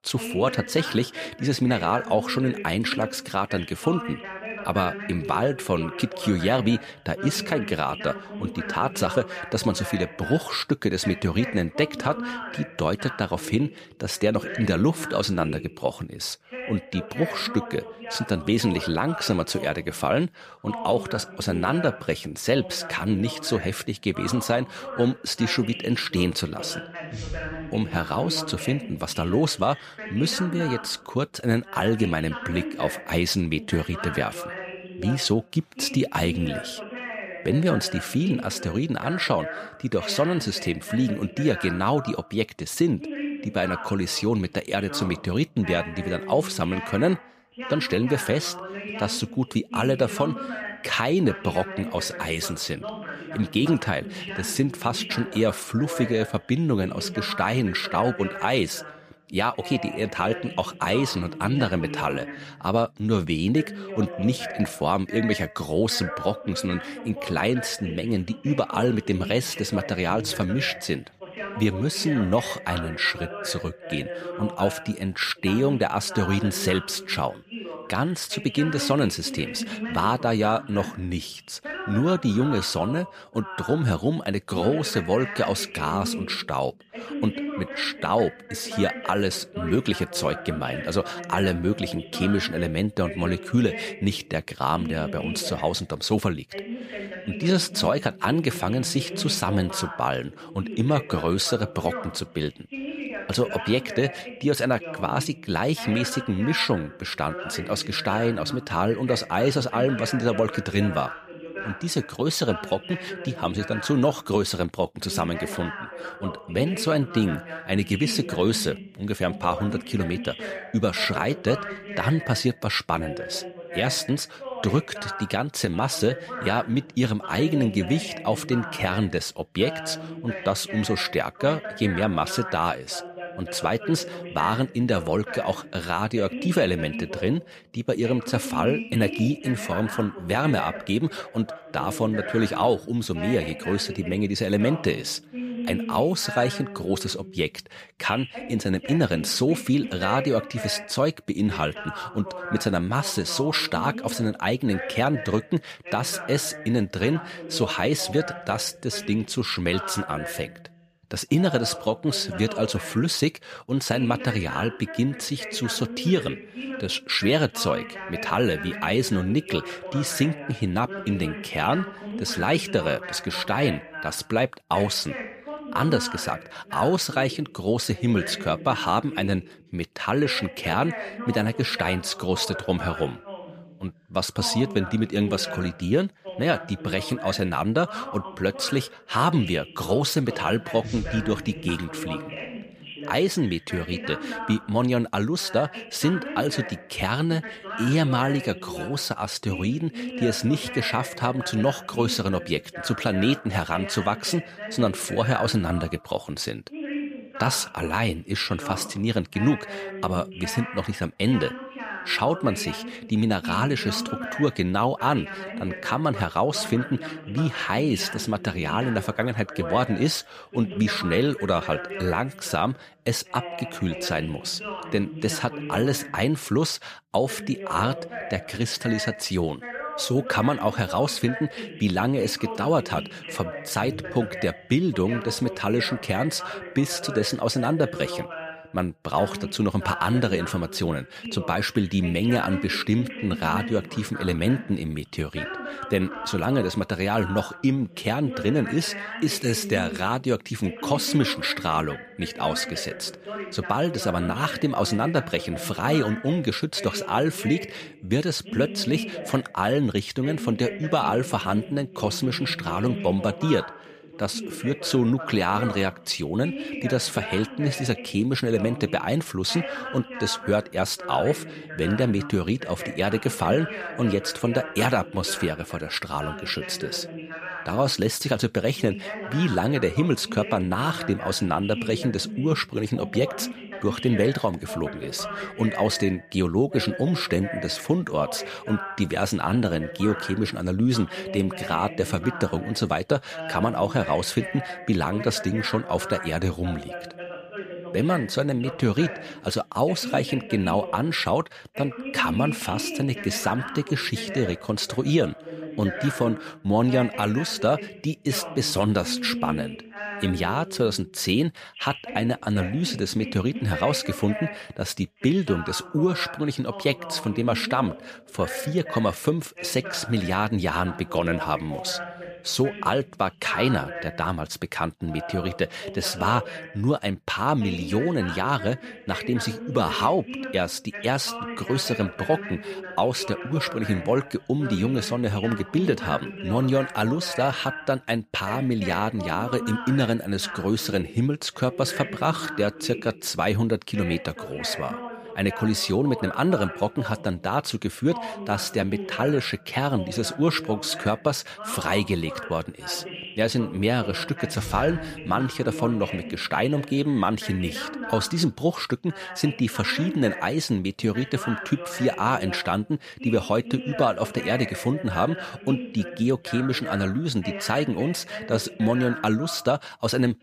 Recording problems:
voice in the background; loud; throughout; 10 dB below the speech

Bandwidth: 14.5 kHz